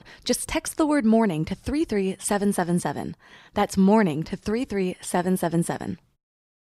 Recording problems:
none

